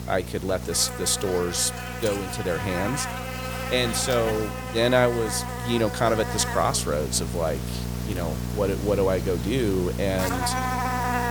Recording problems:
electrical hum; loud; throughout; 60 Hz, 5 dB below the speech

